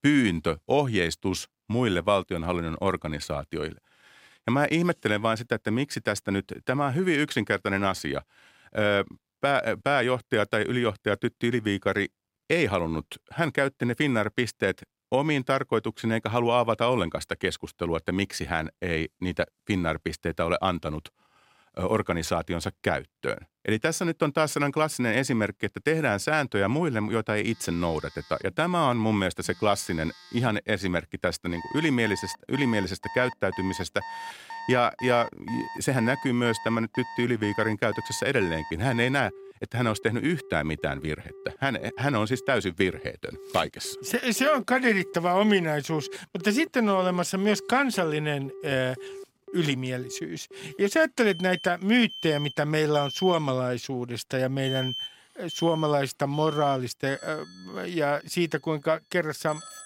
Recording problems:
alarms or sirens; noticeable; from 27 s on; 15 dB below the speech

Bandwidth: 16 kHz